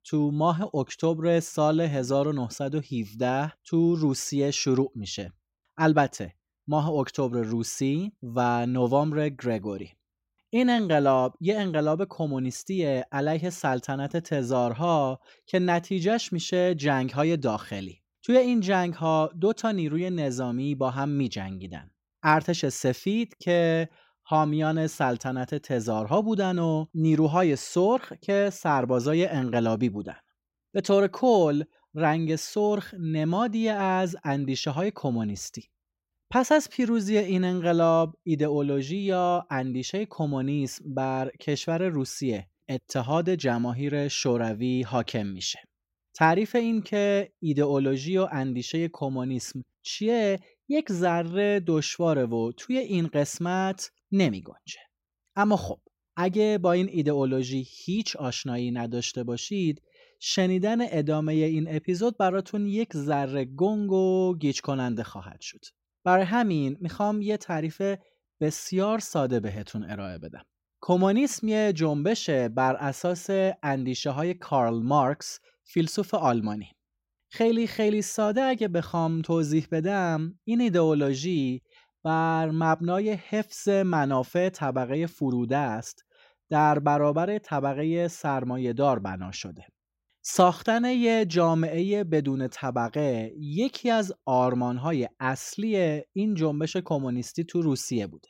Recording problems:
none

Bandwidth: 16 kHz